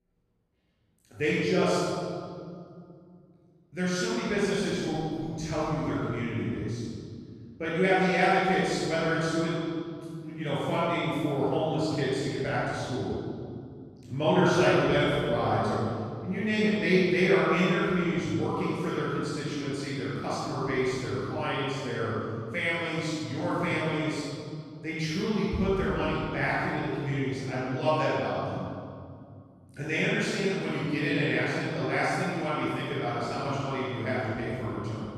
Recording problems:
room echo; strong; dies away in 2.3 s
off-mic speech; far

